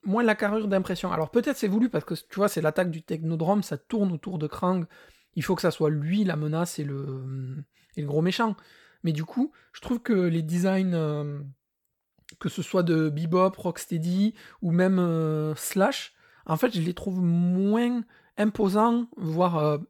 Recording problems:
none

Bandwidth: 18.5 kHz